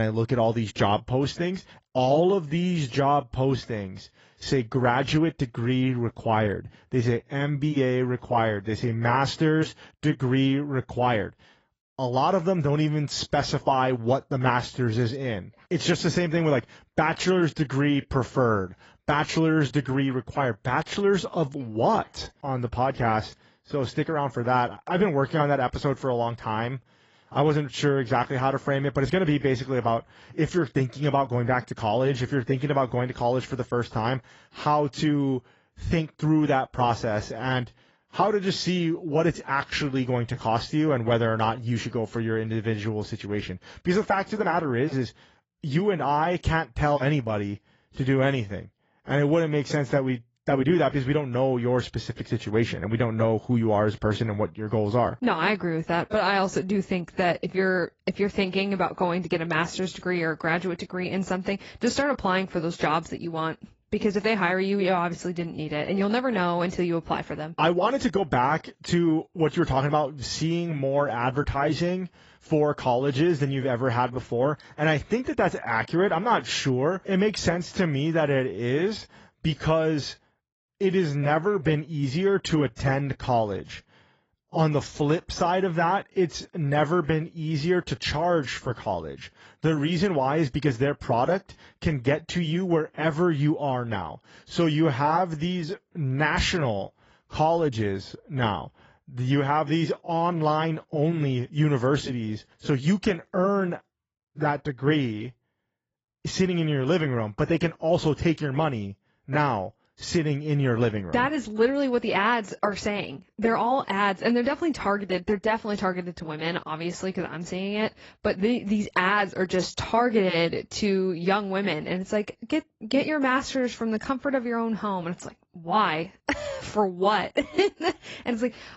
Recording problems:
garbled, watery; badly; nothing above 7.5 kHz
abrupt cut into speech; at the start

